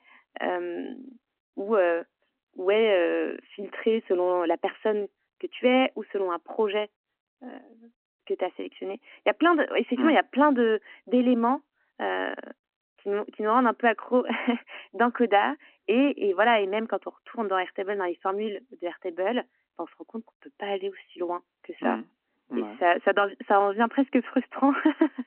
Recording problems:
phone-call audio

